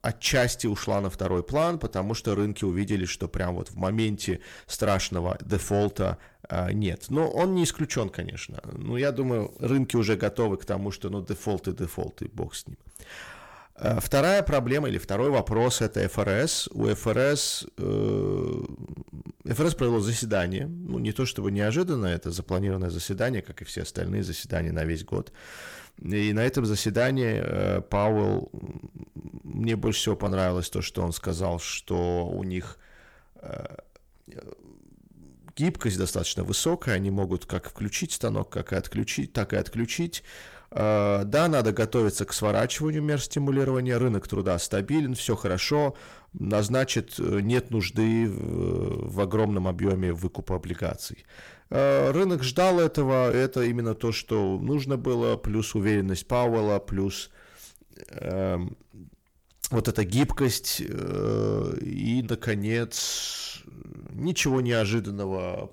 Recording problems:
distortion; slight; 10 dB below the speech

